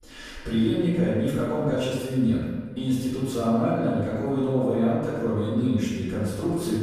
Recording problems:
room echo; strong; dies away in 1.4 s
off-mic speech; far

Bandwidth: 15 kHz